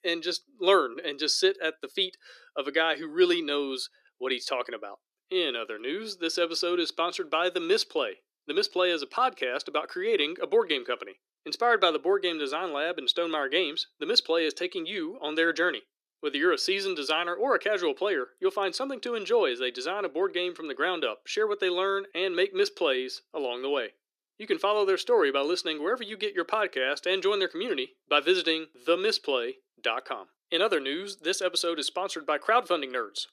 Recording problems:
thin; somewhat; fading below 300 Hz

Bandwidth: 14.5 kHz